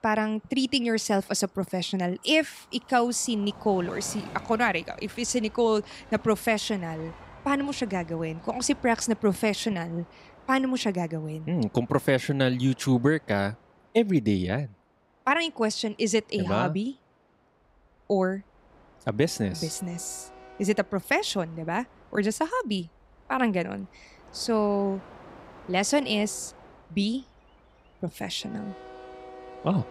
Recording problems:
train or aircraft noise; faint; throughout; 20 dB below the speech

